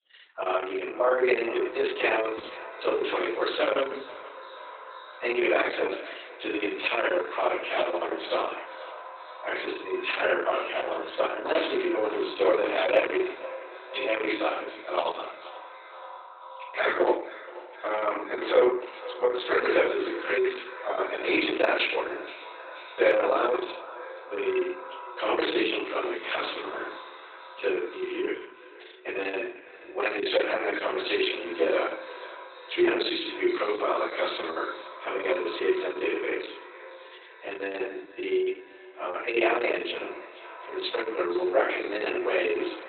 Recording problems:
off-mic speech; far
garbled, watery; badly; nothing above 4 kHz
thin; very; fading below 300 Hz
echo of what is said; noticeable; throughout; 480 ms later, 15 dB below the speech
room echo; noticeable; dies away in 0.5 s

